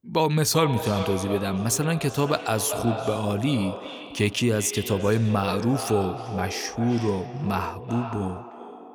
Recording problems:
echo of what is said; strong; throughout; 390 ms later, 9 dB below the speech

